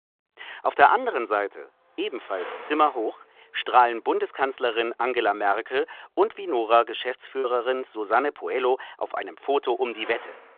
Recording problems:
phone-call audio
traffic noise; noticeable; throughout; 15 dB below the speech
choppy; occasionally; at 7.5 s; 1% of the speech affected

